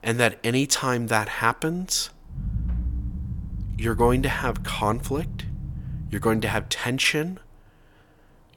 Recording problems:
low rumble; faint; from 2.5 to 6.5 s; 20 dB below the speech

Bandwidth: 17.5 kHz